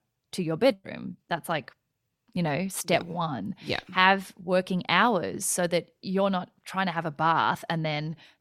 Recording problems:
none

